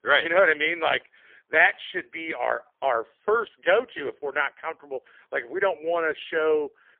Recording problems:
phone-call audio; poor line; nothing above 3.5 kHz

